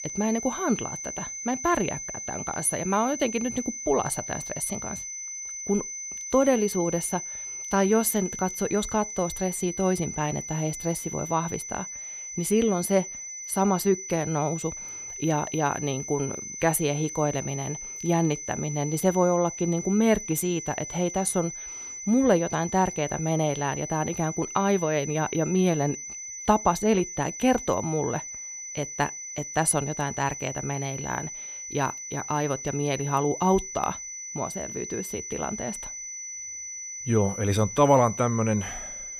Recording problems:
high-pitched whine; loud; throughout; 6 kHz, 8 dB below the speech

